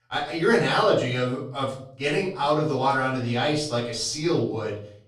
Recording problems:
off-mic speech; far
room echo; noticeable; dies away in 0.5 s

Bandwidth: 13.5 kHz